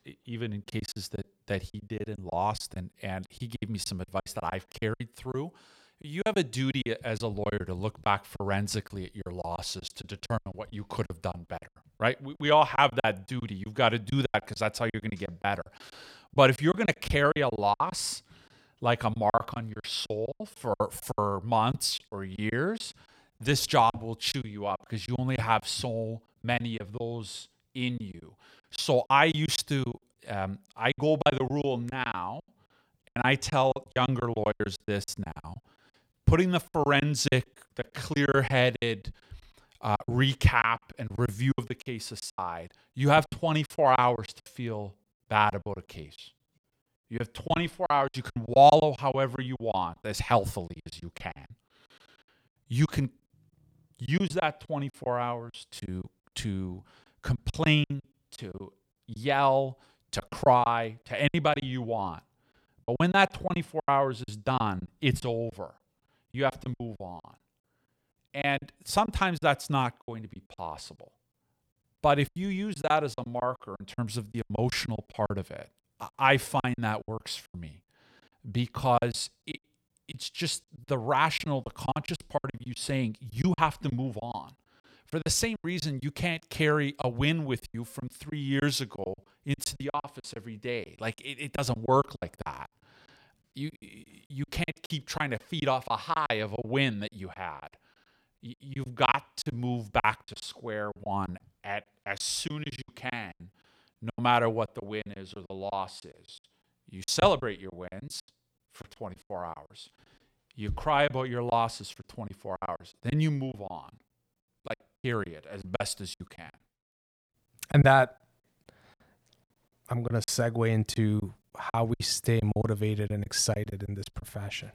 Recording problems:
choppy; very; 14% of the speech affected

